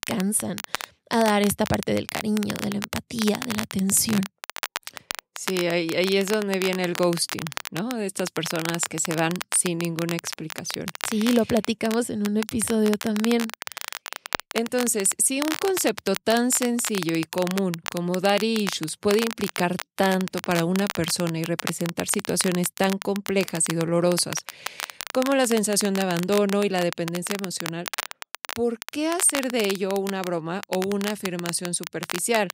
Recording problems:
crackle, like an old record; loud; 9 dB below the speech

